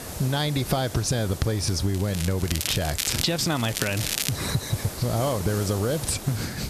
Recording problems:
squashed, flat; heavily
crackling; loud; from 2 to 4.5 s; 3 dB below the speech
hiss; noticeable; throughout; 10 dB below the speech

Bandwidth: 14 kHz